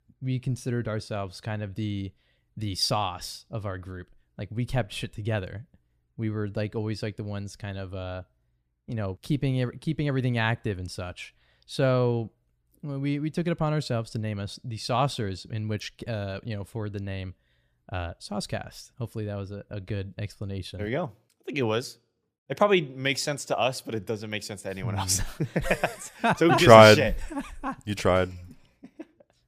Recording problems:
none

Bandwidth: 15 kHz